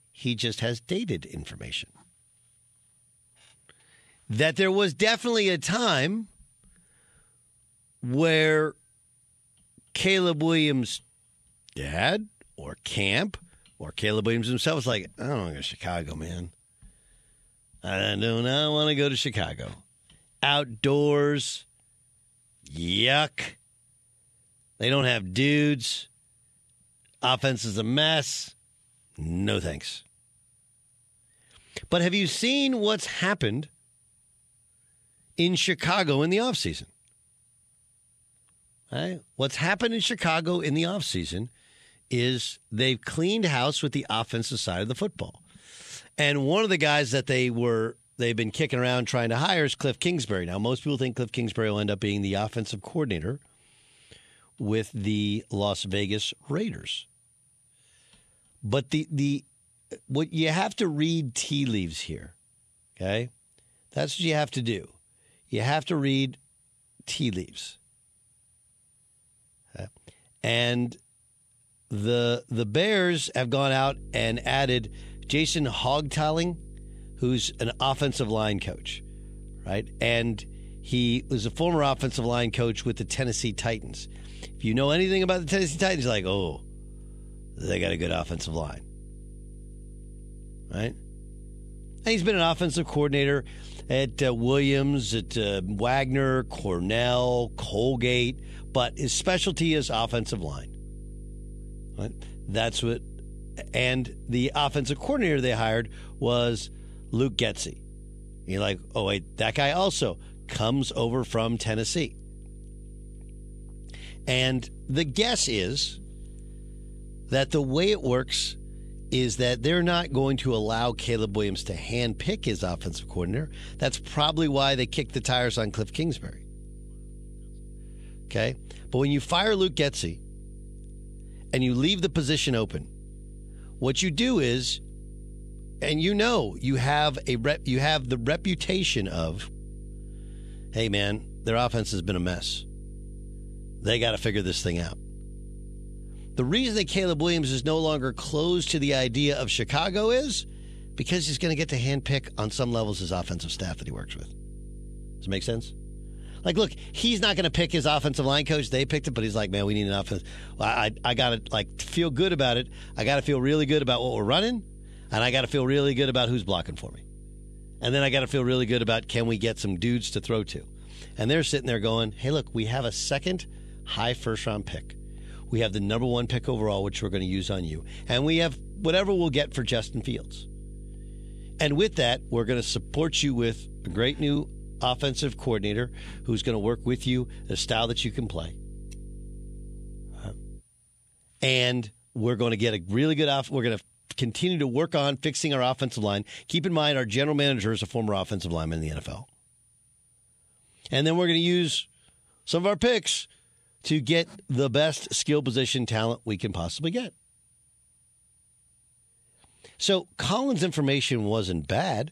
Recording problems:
electrical hum; faint; from 1:14 to 3:11; 50 Hz, 30 dB below the speech

